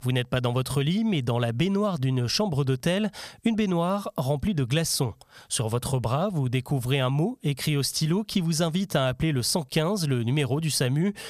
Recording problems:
squashed, flat; somewhat

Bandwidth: 15 kHz